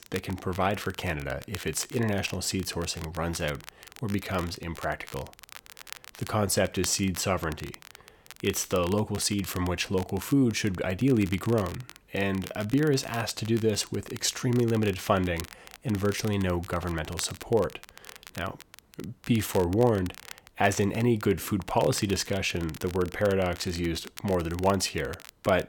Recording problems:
crackle, like an old record; noticeable; 15 dB below the speech

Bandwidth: 18 kHz